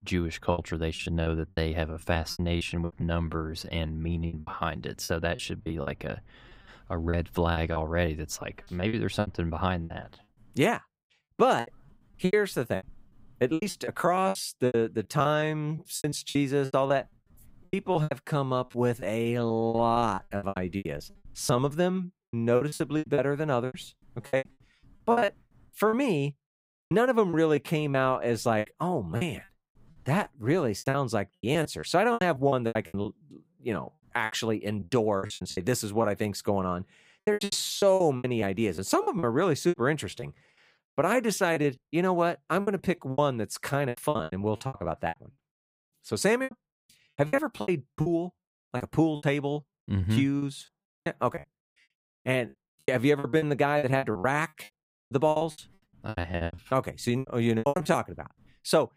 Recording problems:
choppy; very; 17% of the speech affected

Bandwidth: 15.5 kHz